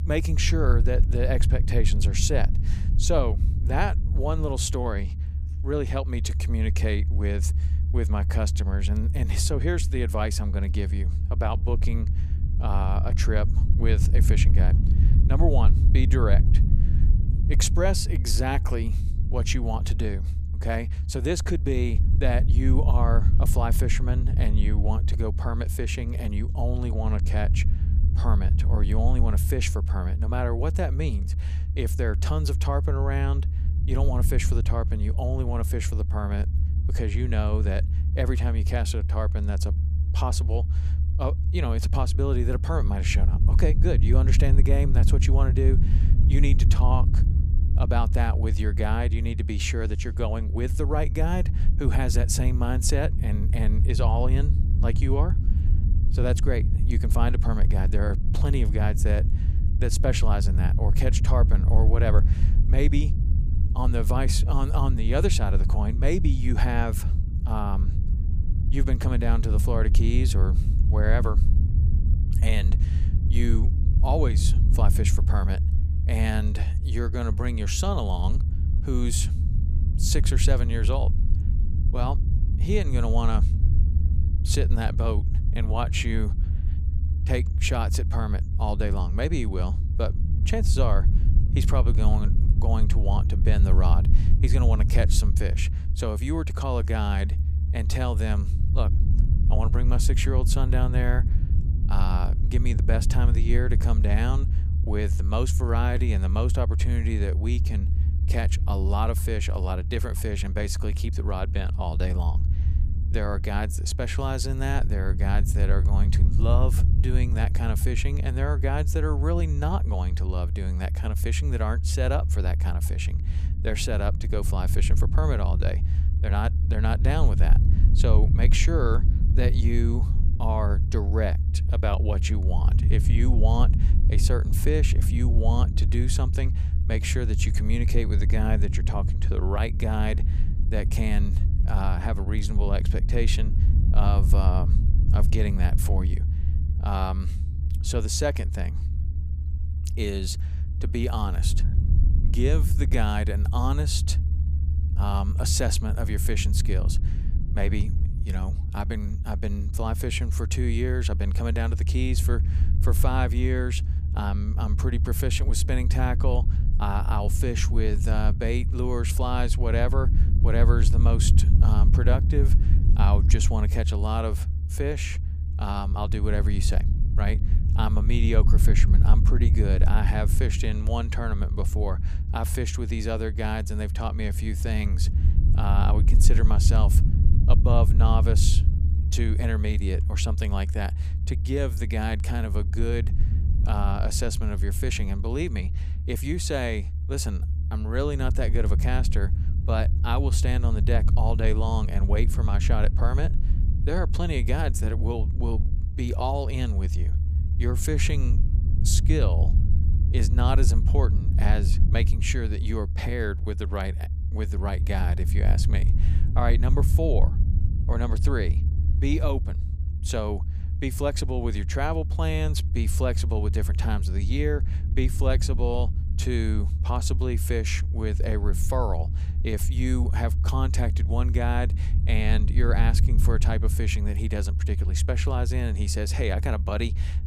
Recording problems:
low rumble; loud; throughout; 9 dB below the speech

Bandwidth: 15 kHz